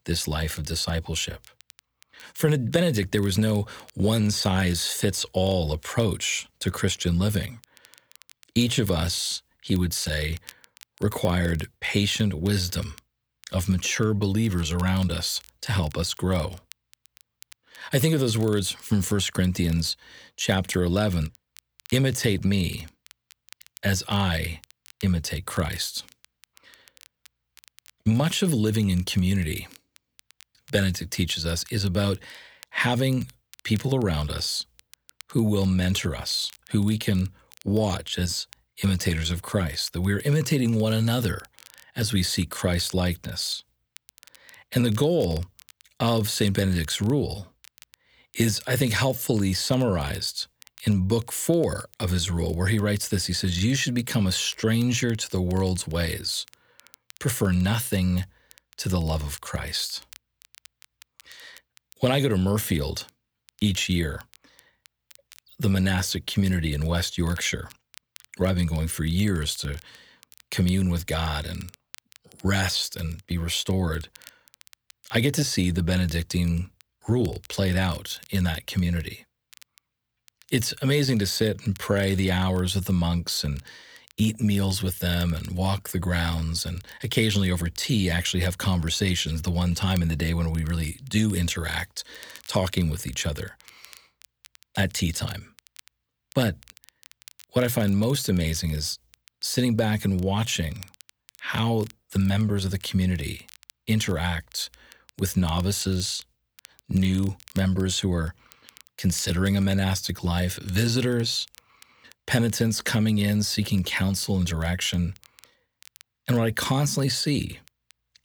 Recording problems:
crackle, like an old record; faint; 25 dB below the speech

